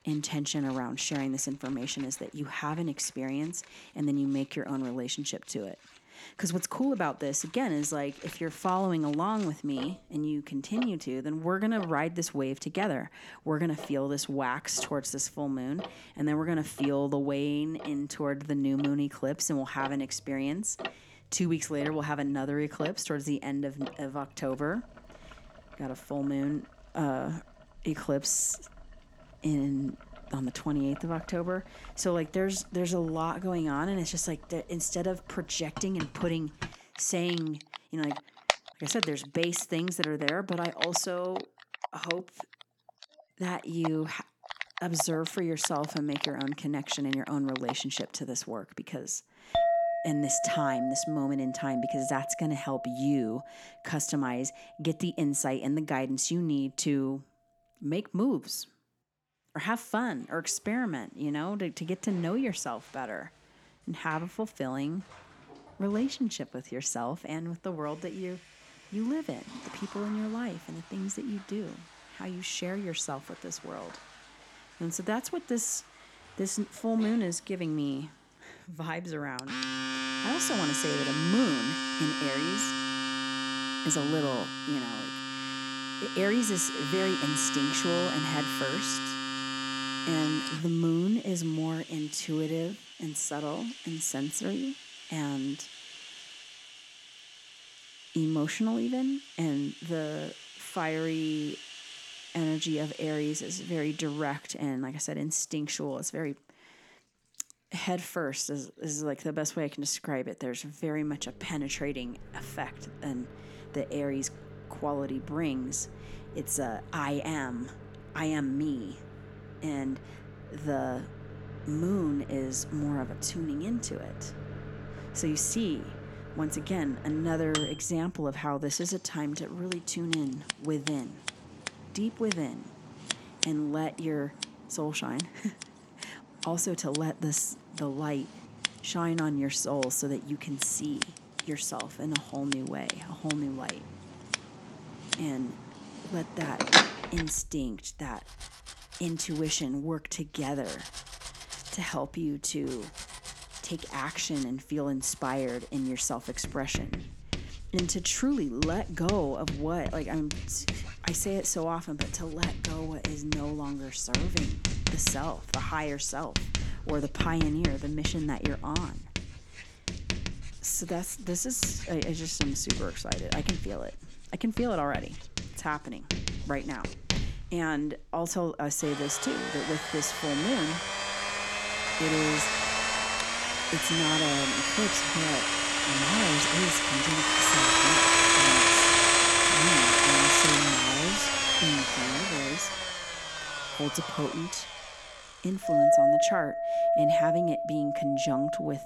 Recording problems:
household noises; very loud; throughout; 3 dB above the speech

